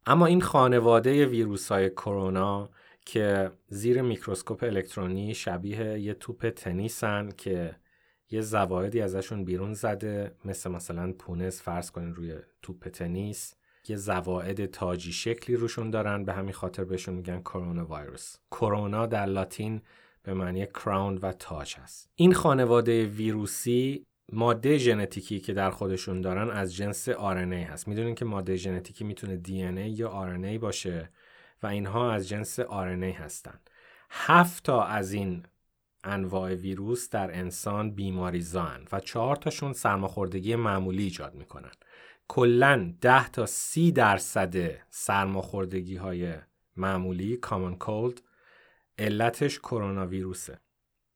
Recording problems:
none

